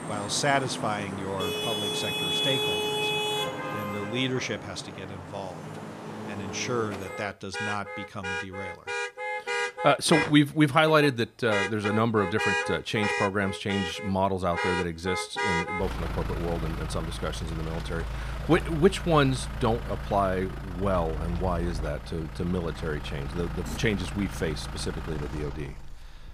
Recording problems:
traffic noise; loud; throughout; 4 dB below the speech

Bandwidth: 15 kHz